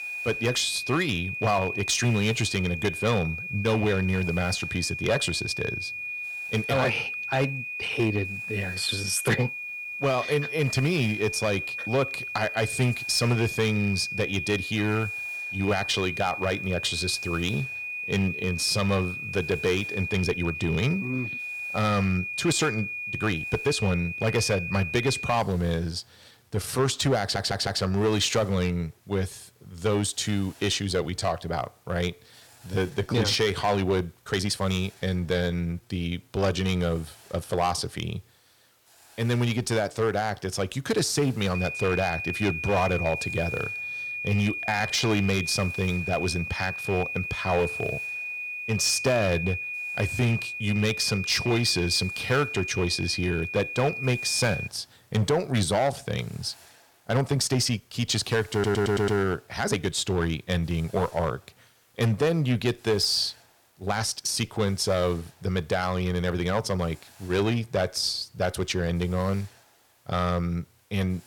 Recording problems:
distortion; slight; 4% of the sound clipped
high-pitched whine; loud; until 25 s and from 42 to 55 s; 2.5 kHz, 5 dB below the speech
hiss; faint; throughout; 30 dB below the speech
uneven, jittery; strongly; from 6.5 s to 1:04
audio stuttering; at 27 s and at 59 s

